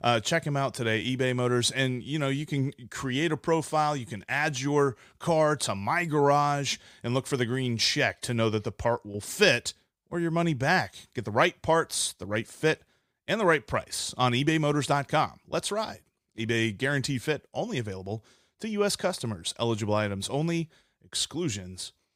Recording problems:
none

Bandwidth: 15.5 kHz